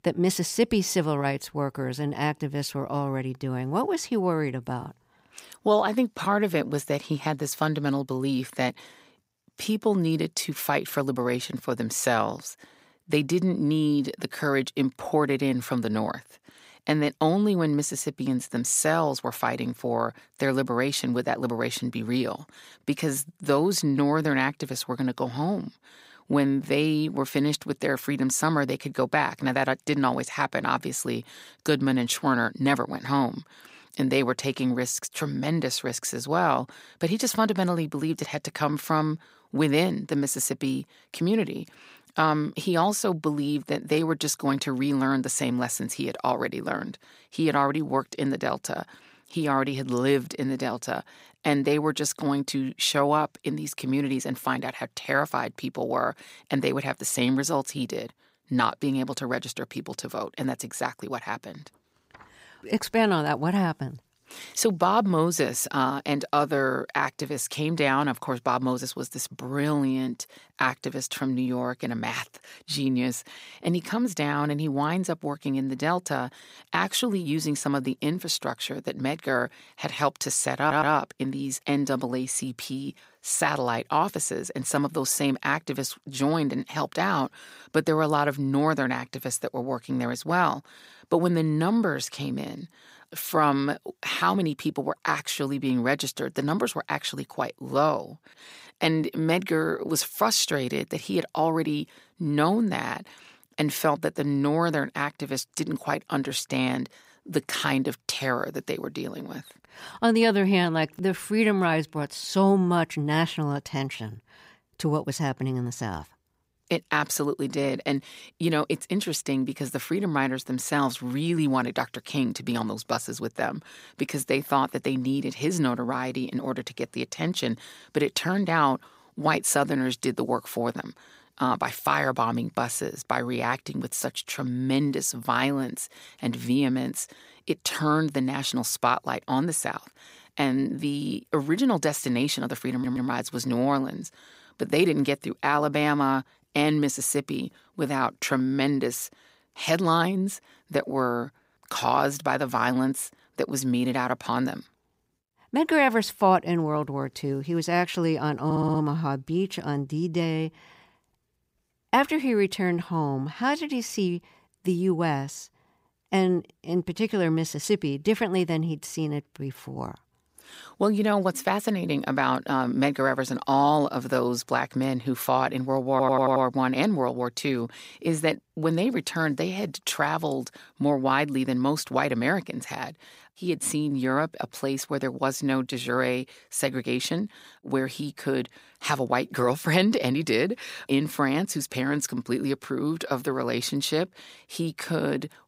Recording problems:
audio stuttering; 4 times, first at 1:21

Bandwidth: 15.5 kHz